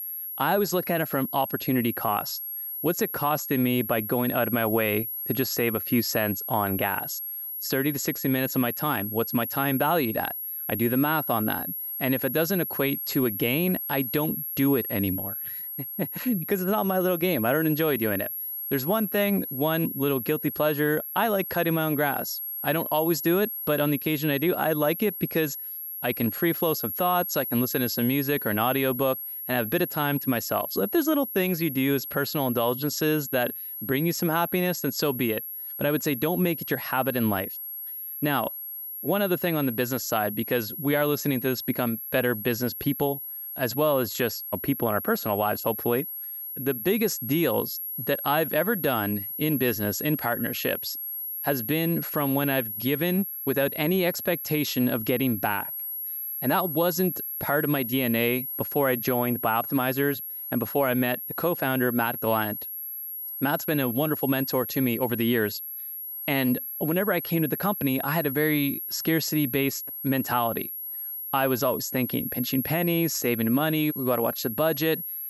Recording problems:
high-pitched whine; loud; throughout; 11.5 kHz, 5 dB below the speech

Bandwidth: 18.5 kHz